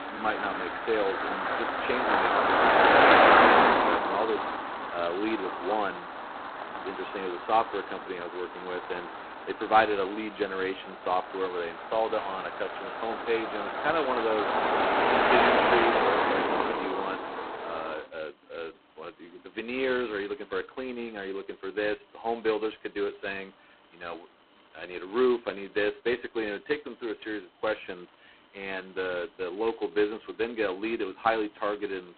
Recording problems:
phone-call audio; poor line; nothing above 4 kHz
traffic noise; very loud; throughout; 6 dB above the speech

